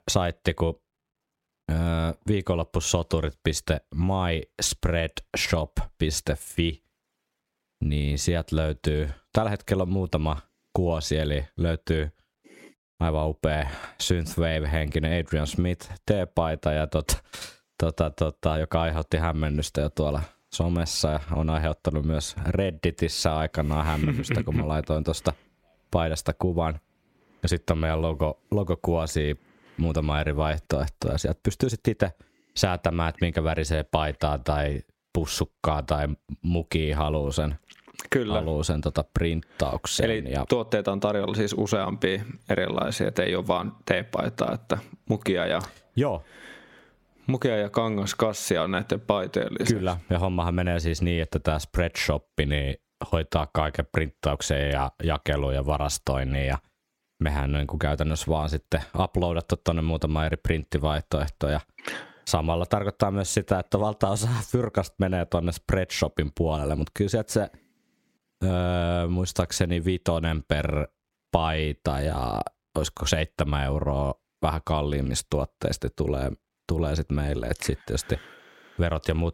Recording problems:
squashed, flat; somewhat

